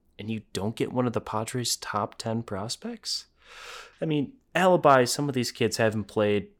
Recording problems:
none

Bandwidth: 18 kHz